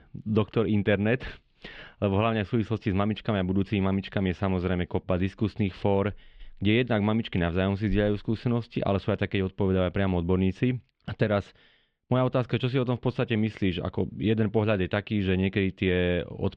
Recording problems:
muffled; slightly; fading above 3.5 kHz

